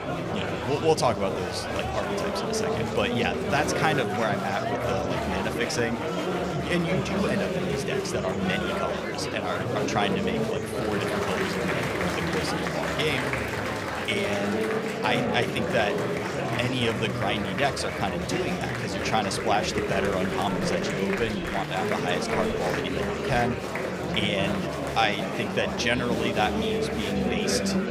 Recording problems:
murmuring crowd; very loud; throughout; 1 dB above the speech

